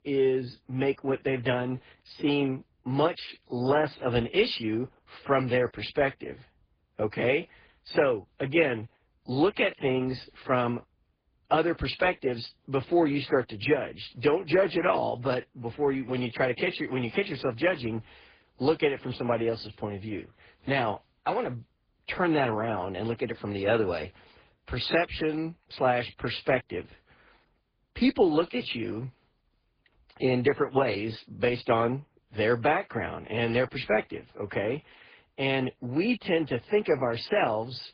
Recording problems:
garbled, watery; badly; nothing above 4.5 kHz

